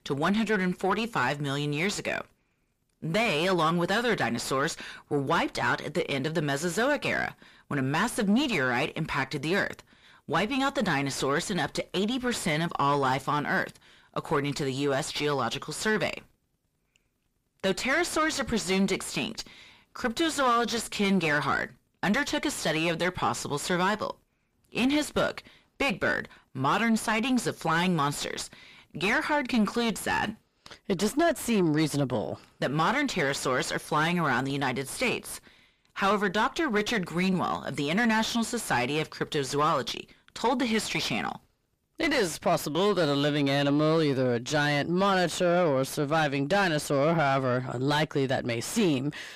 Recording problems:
distortion; heavy; 6 dB below the speech

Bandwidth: 15 kHz